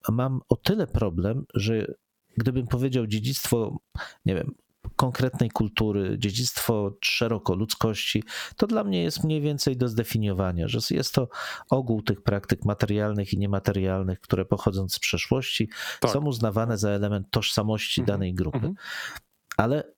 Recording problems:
squashed, flat; somewhat

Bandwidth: 17.5 kHz